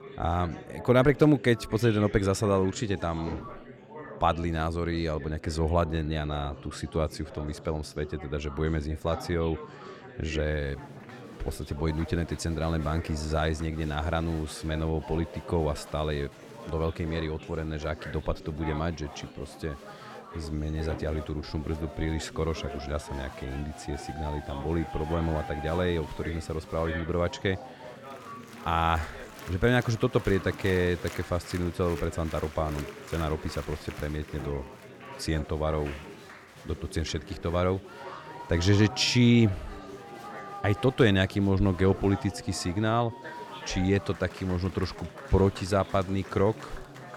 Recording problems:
chatter from many people; noticeable; throughout; 15 dB below the speech

